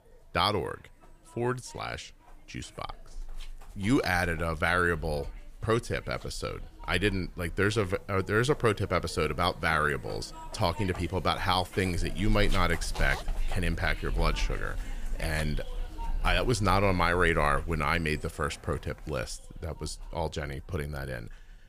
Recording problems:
household noises; noticeable; throughout; 10 dB below the speech

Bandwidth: 15 kHz